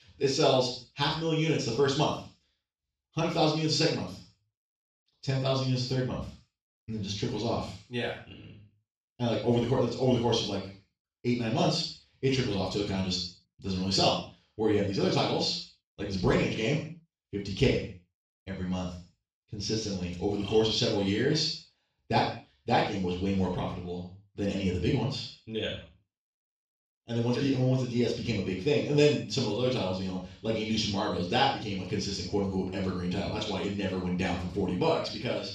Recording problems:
off-mic speech; far
room echo; noticeable; dies away in 0.4 s

